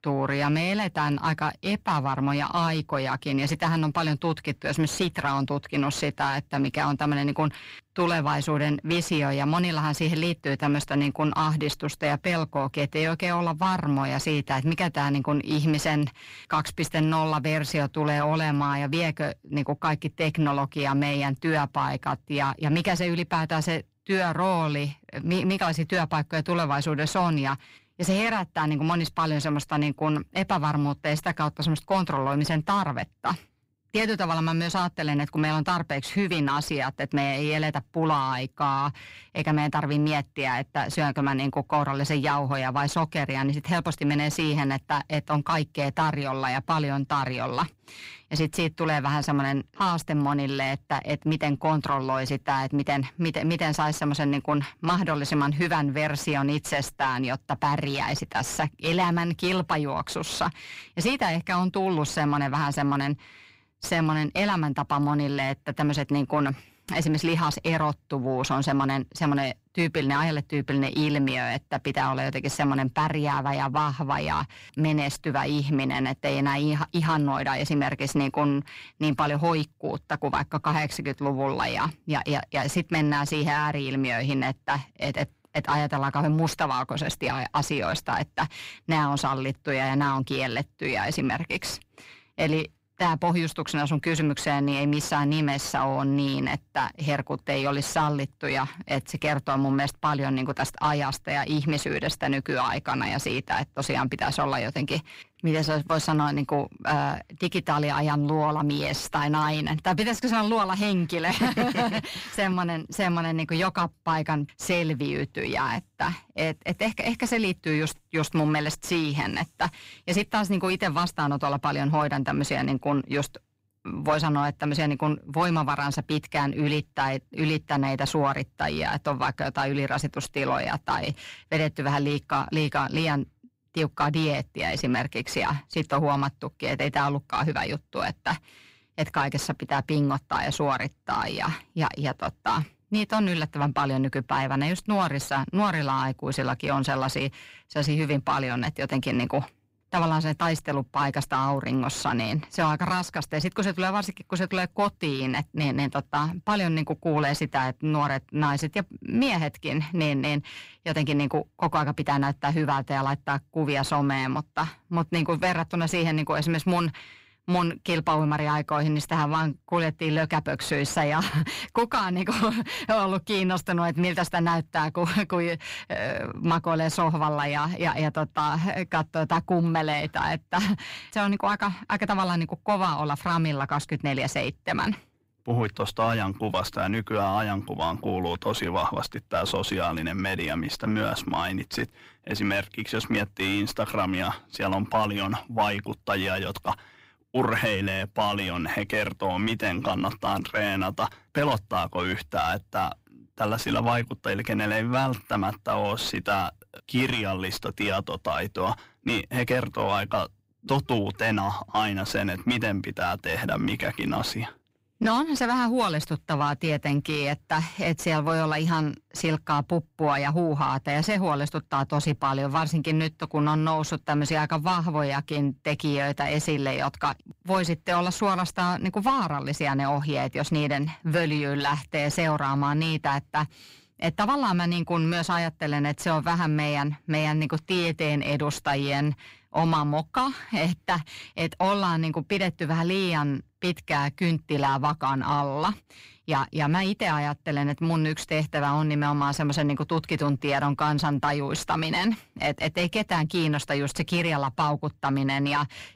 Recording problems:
distortion; slight; 10 dB below the speech

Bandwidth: 15.5 kHz